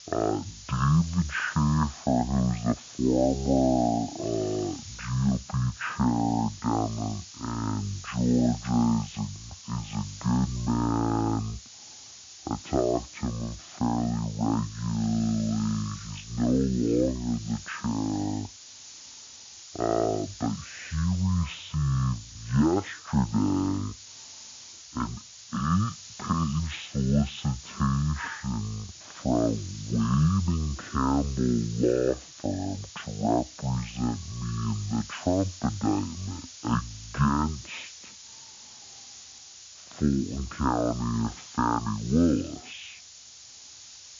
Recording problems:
high frequencies cut off; severe; nothing above 4 kHz
wrong speed and pitch; too slow and too low; 0.5 times normal speed
hiss; noticeable; throughout; 15 dB below the speech

